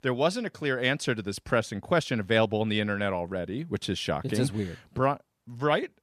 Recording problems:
none

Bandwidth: 14.5 kHz